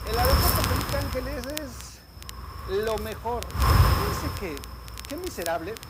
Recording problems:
wind noise on the microphone; heavy; 4 dB above the speech
crackle, like an old record; loud; 8 dB below the speech

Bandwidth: 15.5 kHz